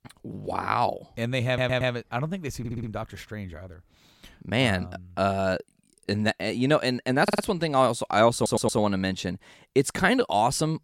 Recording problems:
audio stuttering; 4 times, first at 1.5 s

